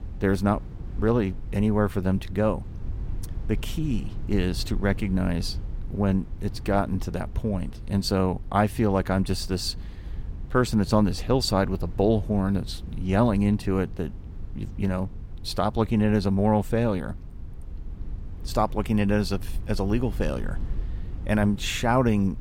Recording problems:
low rumble; faint; throughout; 25 dB below the speech

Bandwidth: 16 kHz